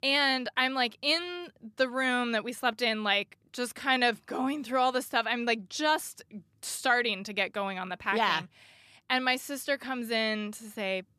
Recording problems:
none

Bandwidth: 14 kHz